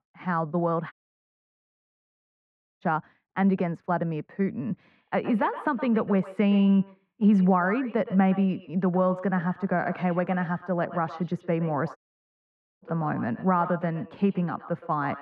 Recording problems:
muffled; very; fading above 1.5 kHz
echo of what is said; noticeable; from 5 s on; 120 ms later, 15 dB below the speech
audio cutting out; at 1 s for 2 s and at 12 s for 1 s

